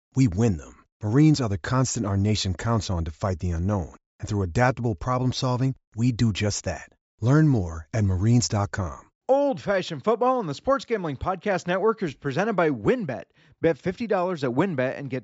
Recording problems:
high frequencies cut off; noticeable; nothing above 8 kHz

